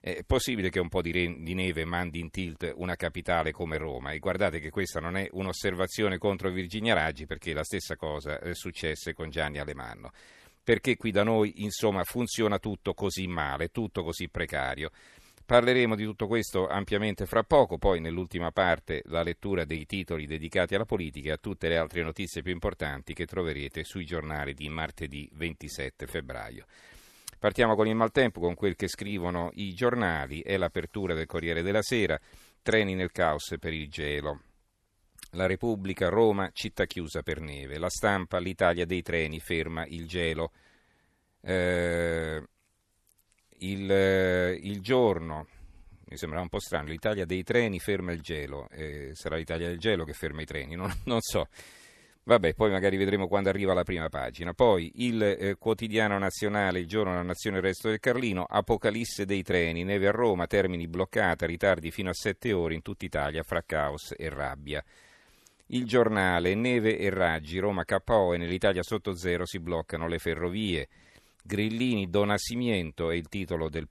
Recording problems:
none

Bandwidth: 13.5 kHz